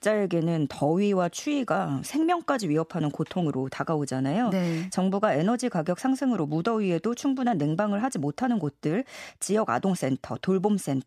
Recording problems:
none

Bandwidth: 14.5 kHz